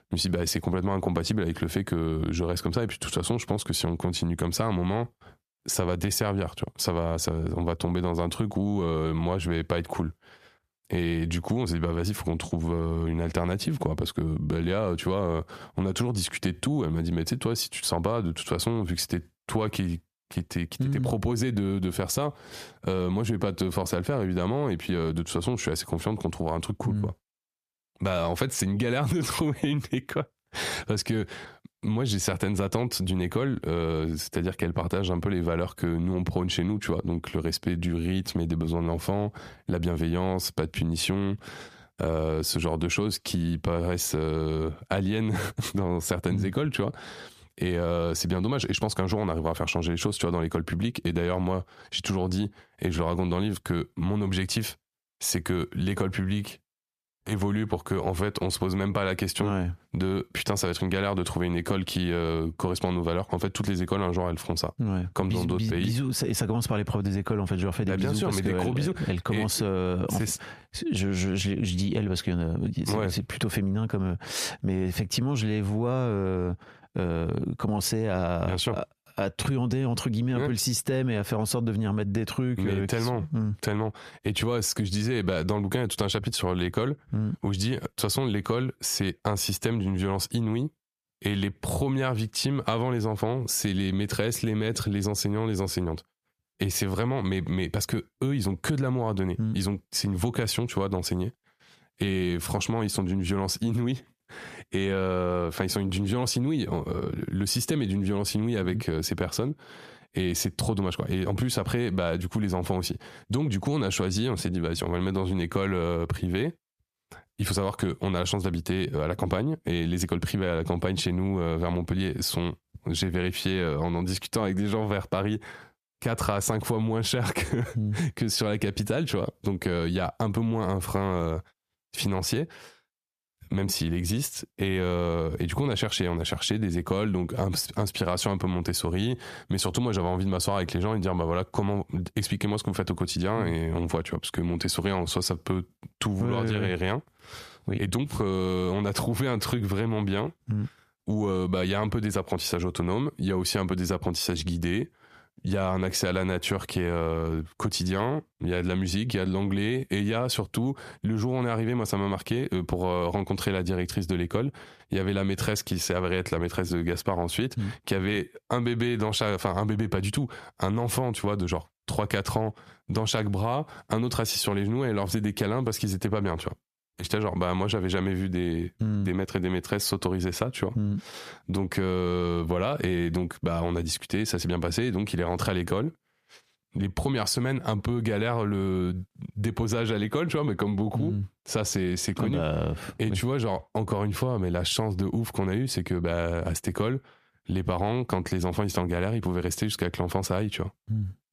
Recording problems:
squashed, flat; heavily

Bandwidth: 14.5 kHz